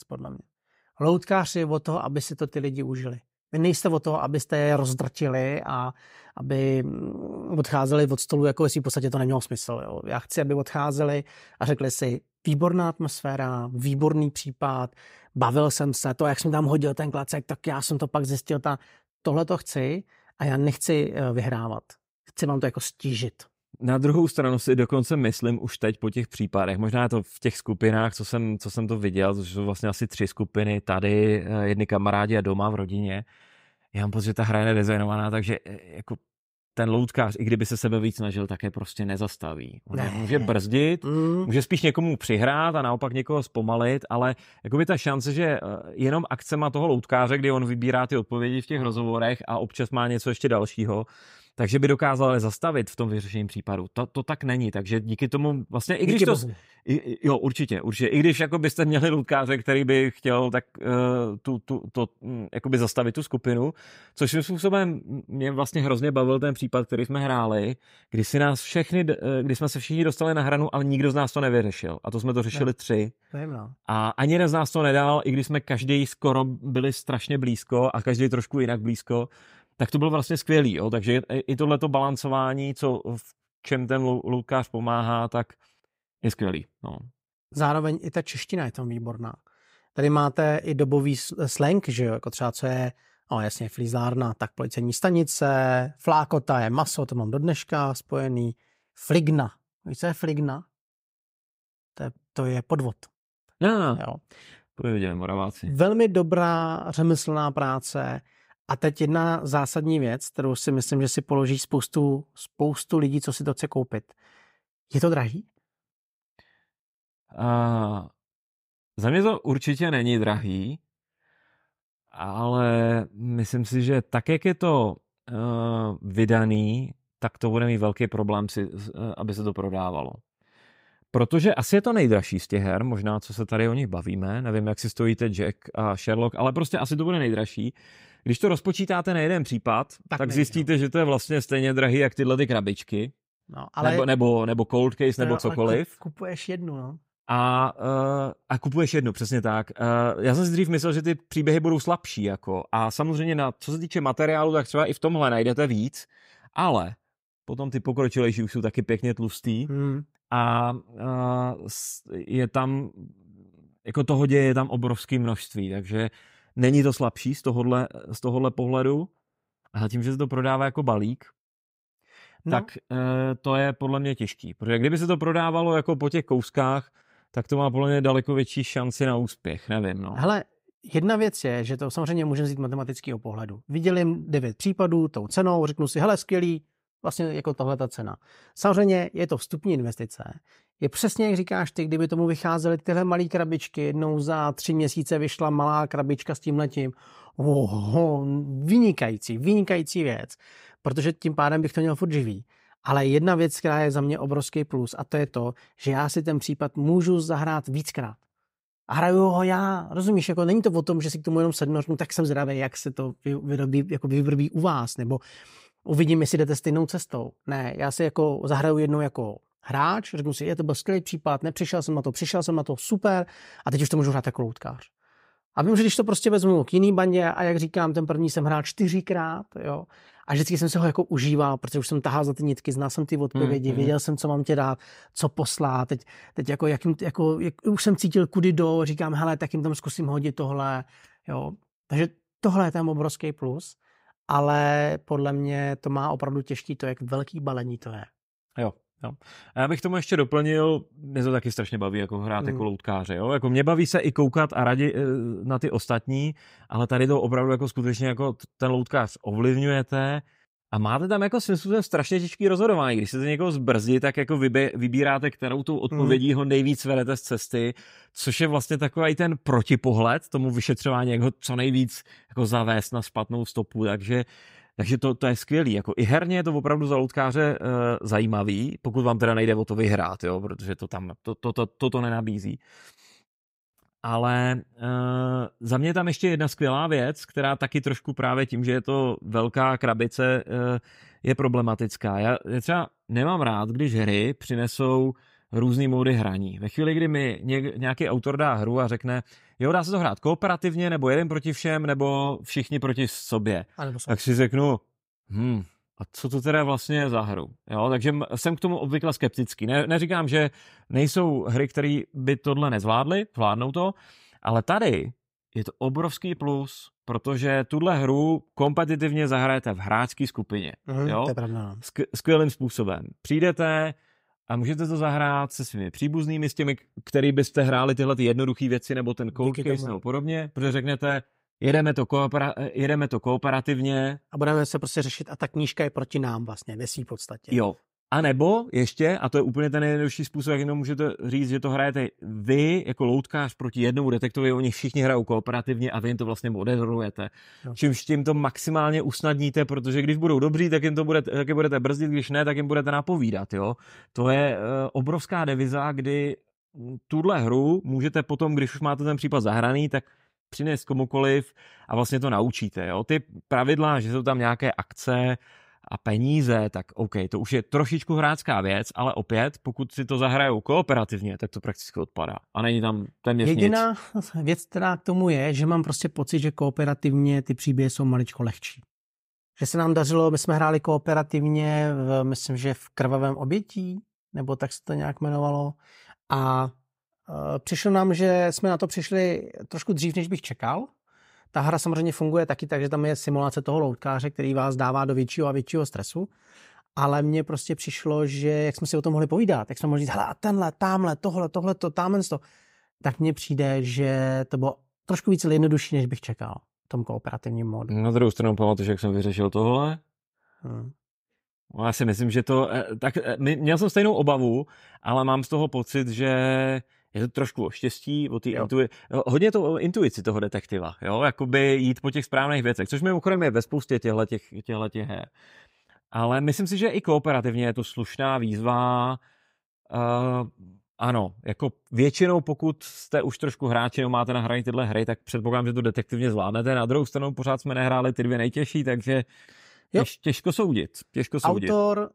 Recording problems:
none

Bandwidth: 15.5 kHz